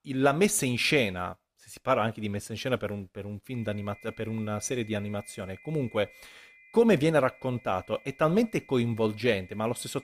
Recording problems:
high-pitched whine; faint; from 3.5 s on; 2 kHz, 25 dB below the speech

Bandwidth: 15 kHz